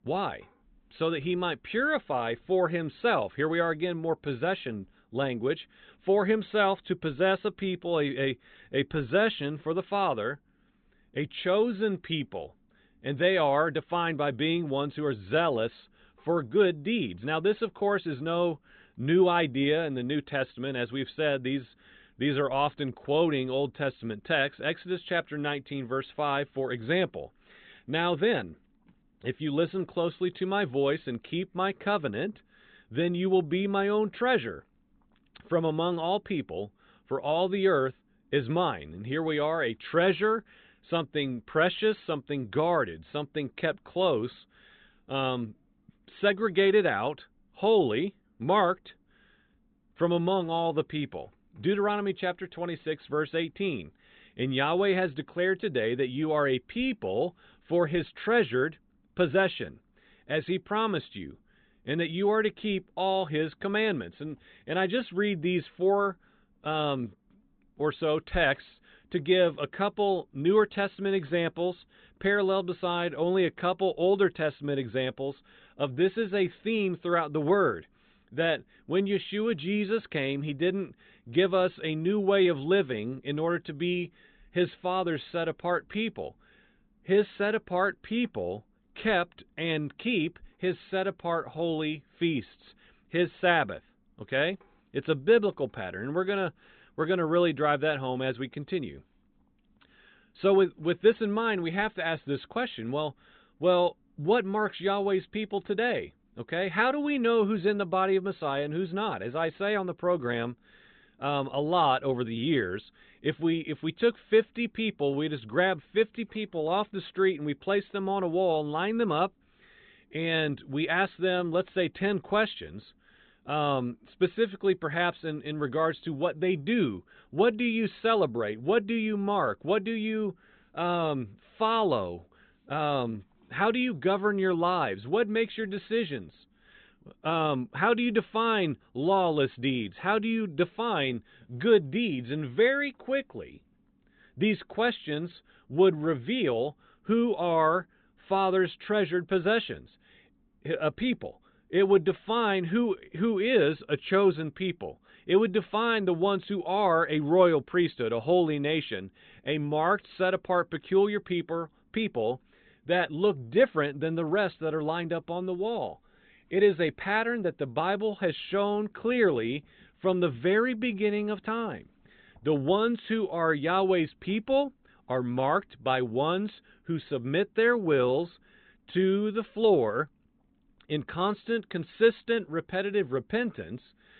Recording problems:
high frequencies cut off; severe; nothing above 4 kHz

